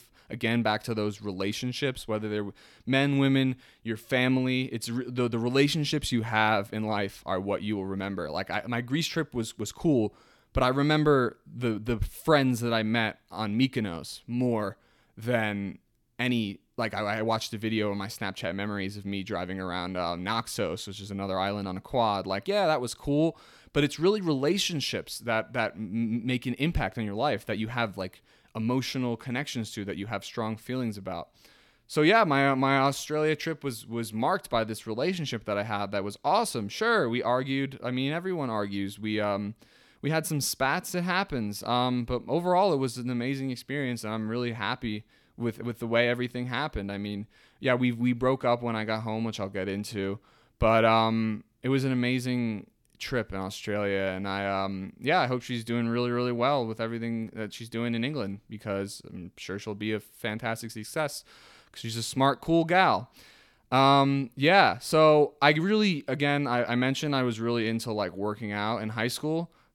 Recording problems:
none

